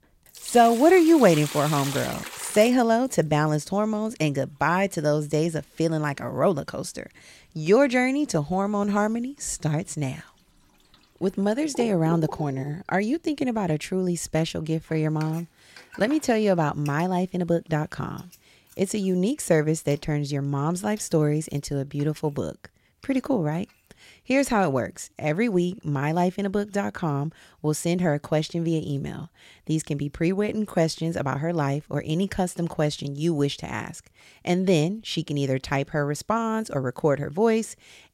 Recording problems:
household noises; noticeable; throughout; 15 dB below the speech

